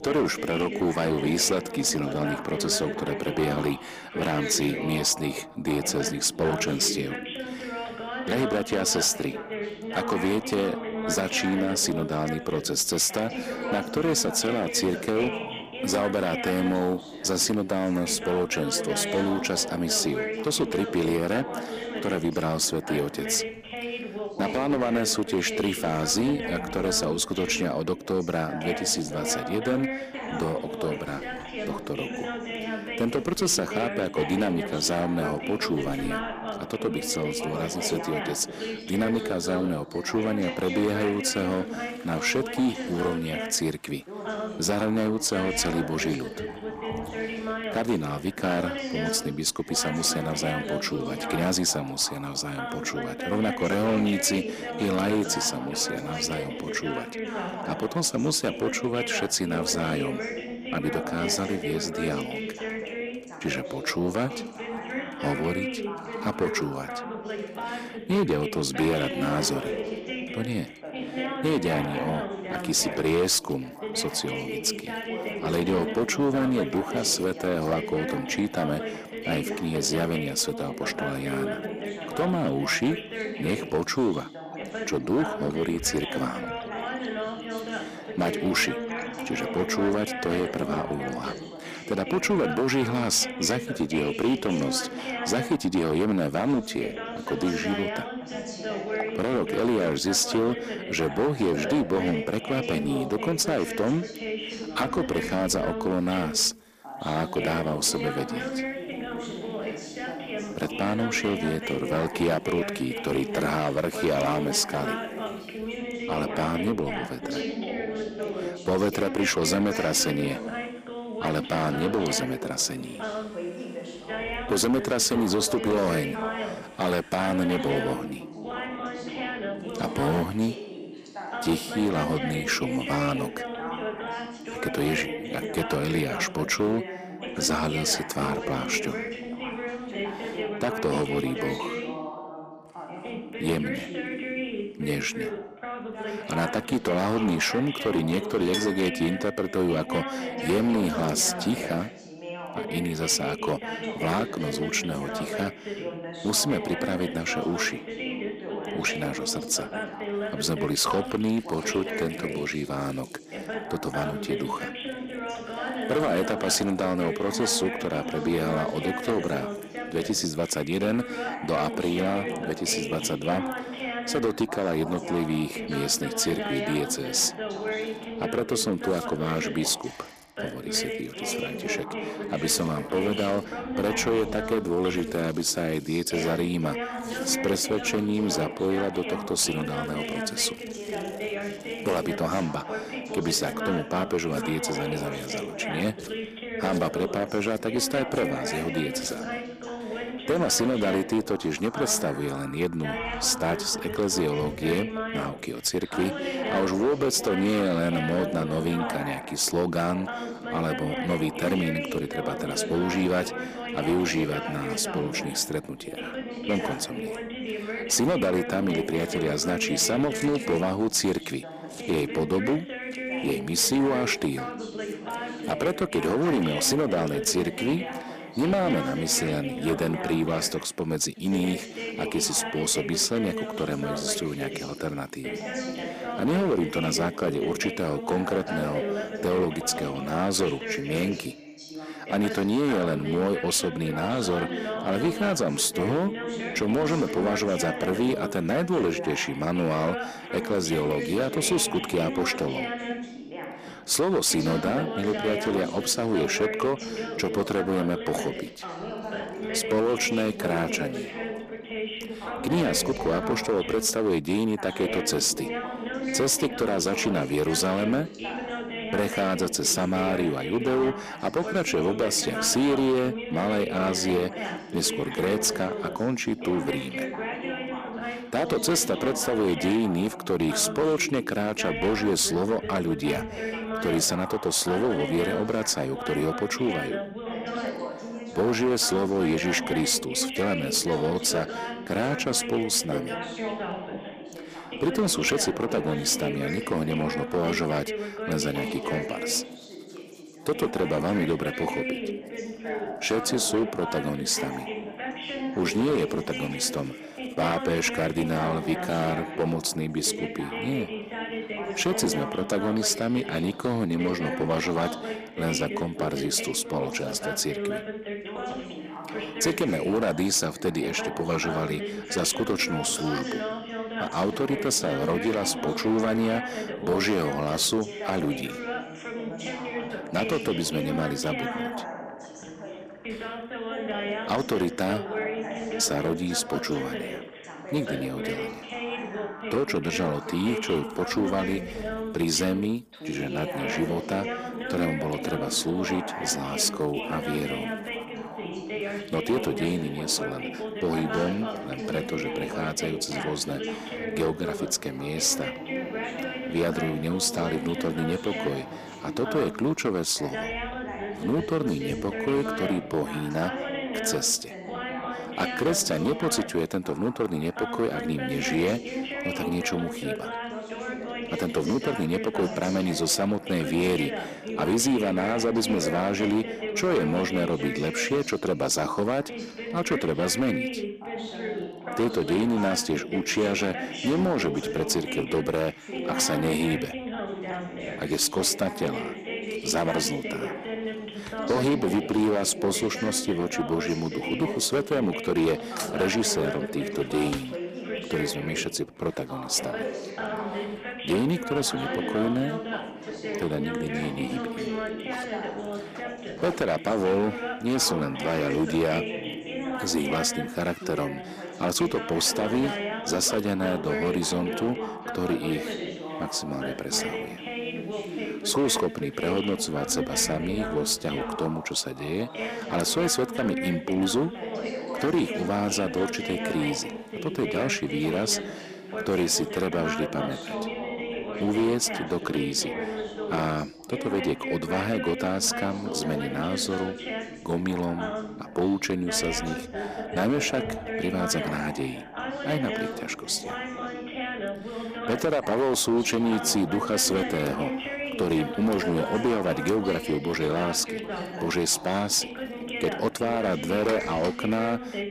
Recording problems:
distortion; slight; 5% of the sound clipped
background chatter; loud; throughout; 2 voices, 7 dB below the speech
household noises; faint; throughout; 25 dB below the speech

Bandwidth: 15 kHz